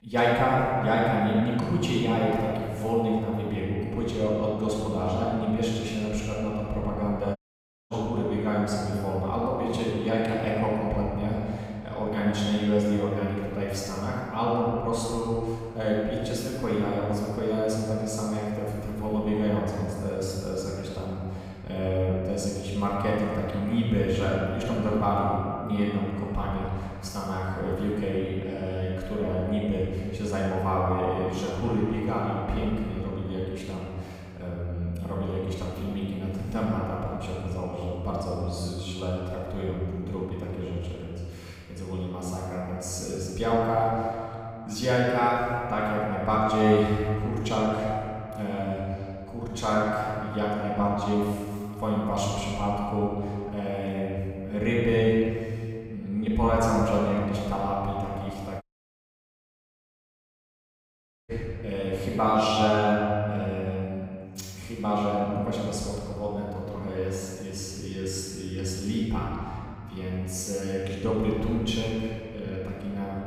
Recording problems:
room echo; strong; dies away in 2.2 s
off-mic speech; far
audio cutting out; at 7.5 s for 0.5 s and at 59 s for 2.5 s

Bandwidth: 15.5 kHz